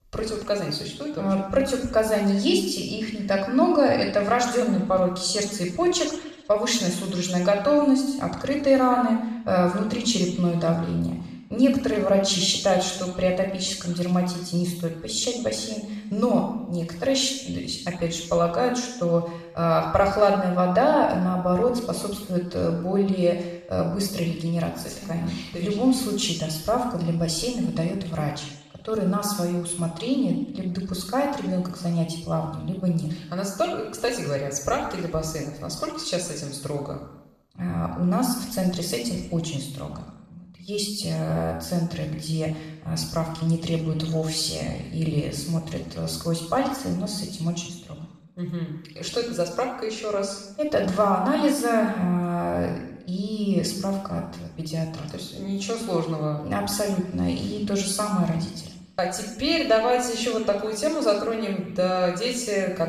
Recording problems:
off-mic speech; far
room echo; noticeable; dies away in 0.8 s

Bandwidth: 14 kHz